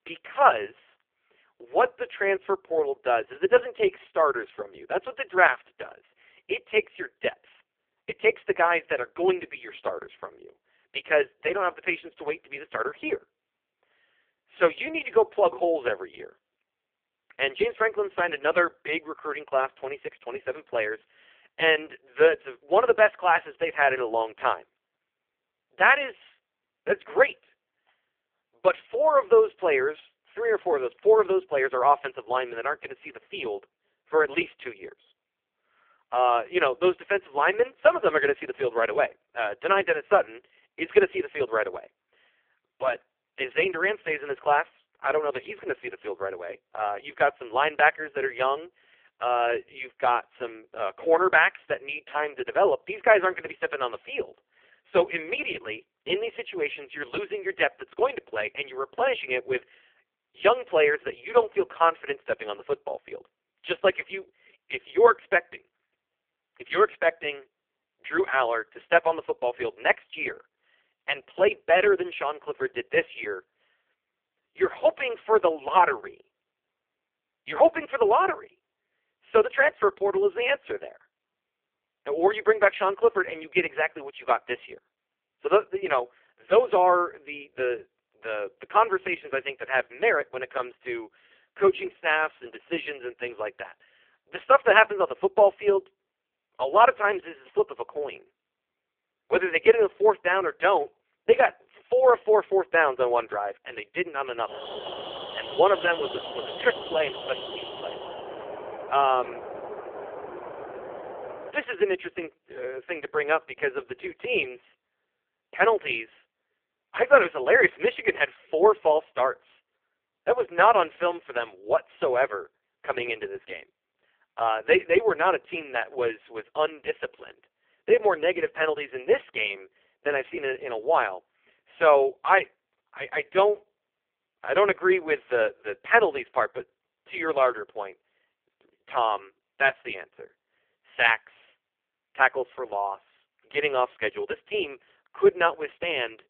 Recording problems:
phone-call audio; poor line
alarm; noticeable; from 1:44 to 1:52; peak 9 dB below the speech

